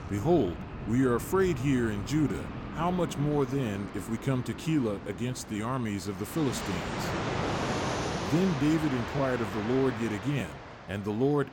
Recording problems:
train or aircraft noise; loud; throughout; 7 dB below the speech

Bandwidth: 17 kHz